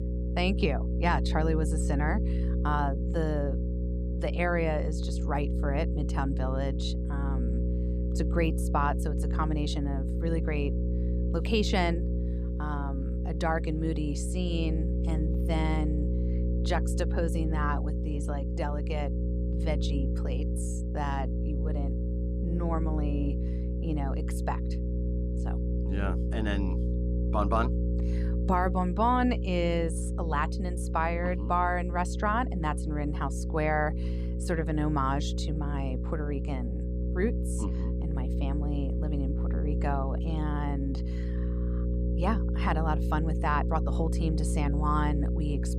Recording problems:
electrical hum; loud; throughout; 60 Hz, 9 dB below the speech

